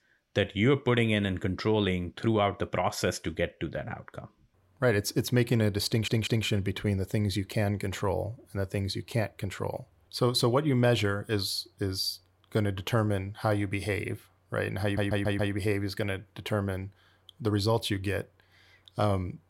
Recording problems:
audio stuttering; at 6 s and at 15 s

